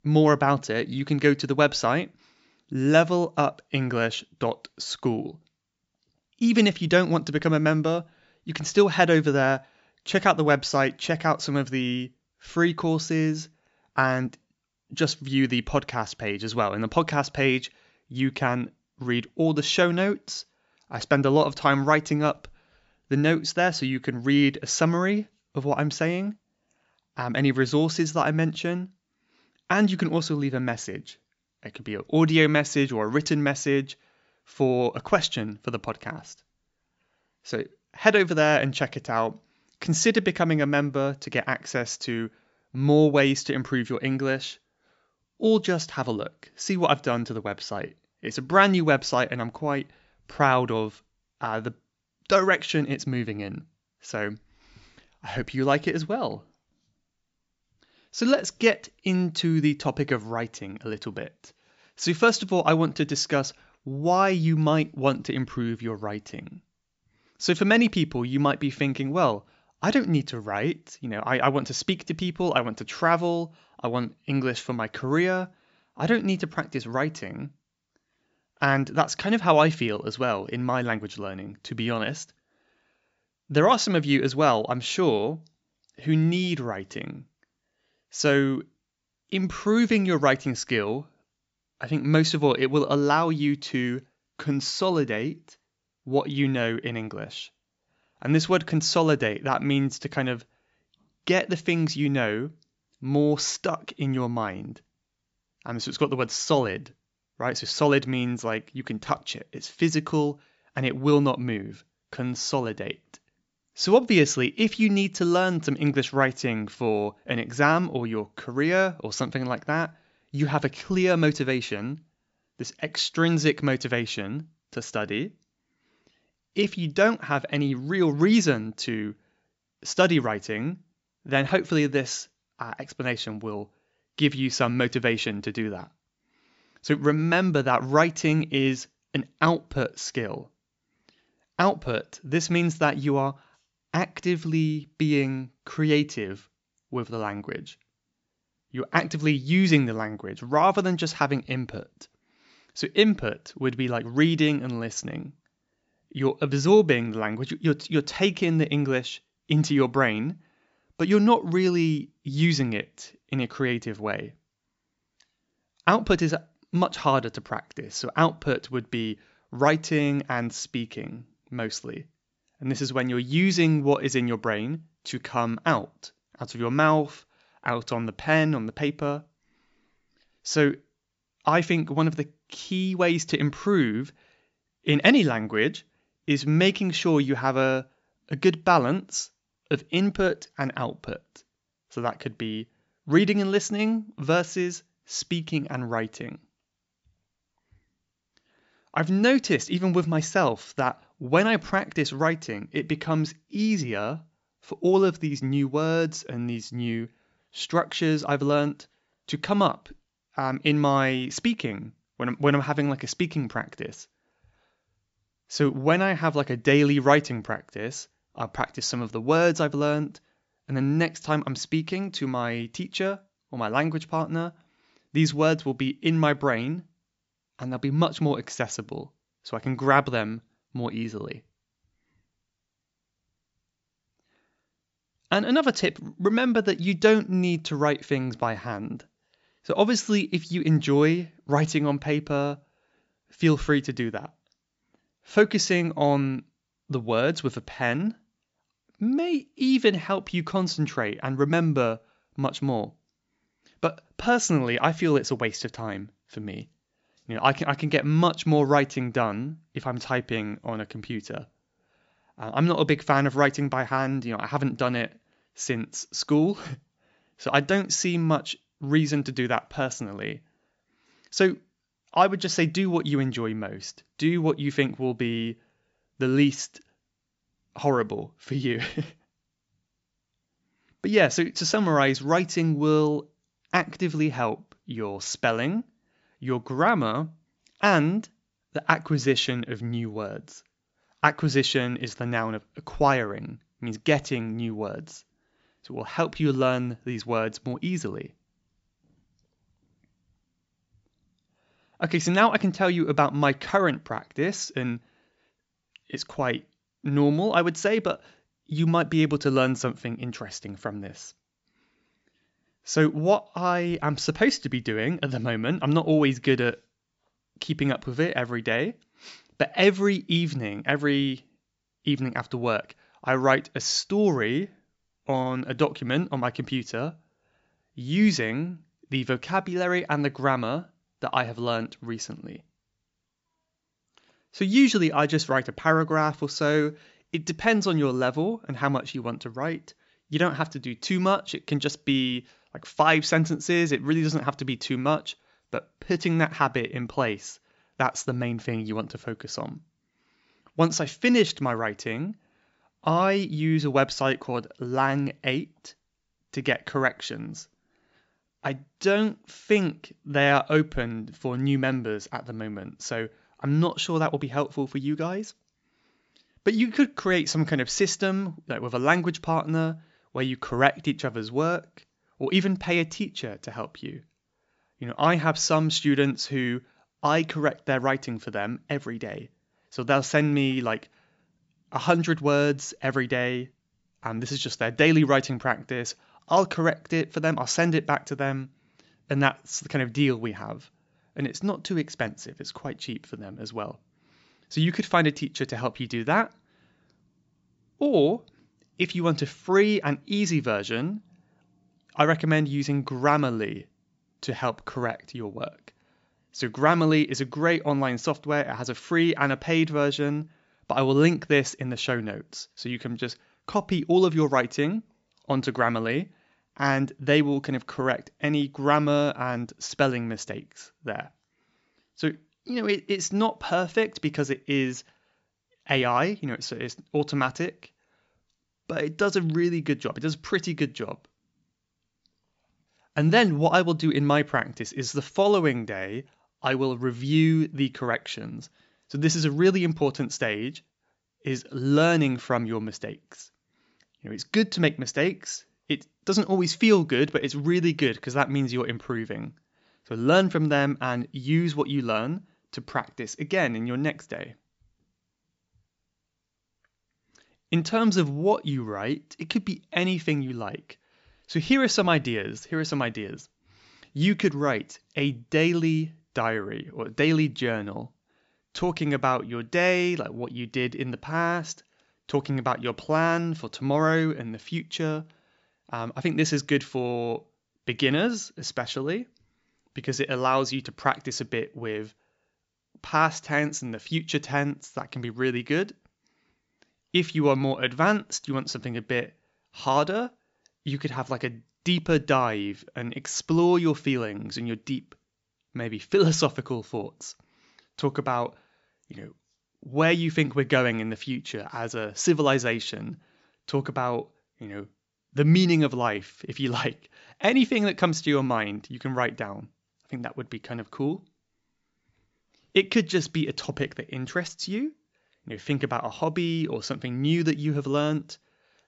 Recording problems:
high frequencies cut off; noticeable; nothing above 8 kHz

